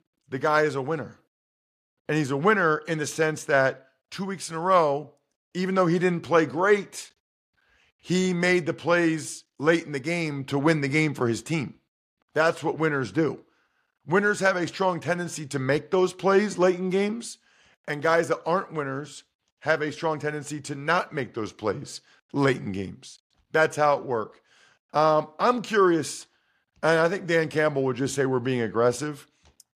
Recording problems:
none

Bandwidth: 14.5 kHz